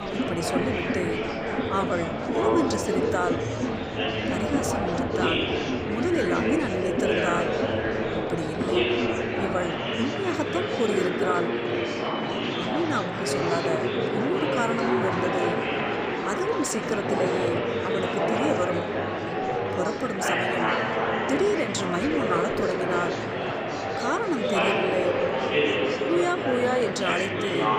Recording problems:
murmuring crowd; very loud; throughout; 3 dB above the speech

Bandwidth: 15 kHz